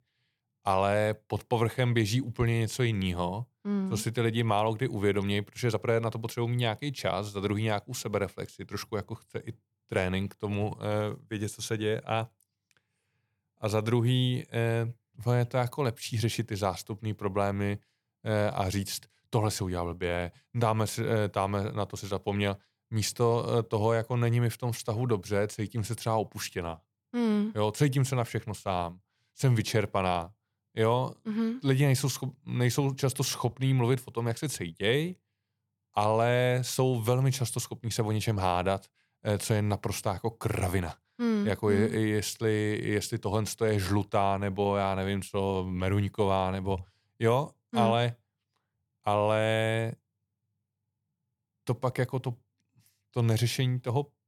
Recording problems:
none

